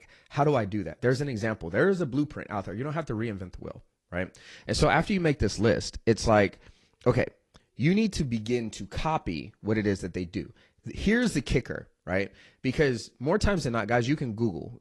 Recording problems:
garbled, watery; slightly; nothing above 11 kHz

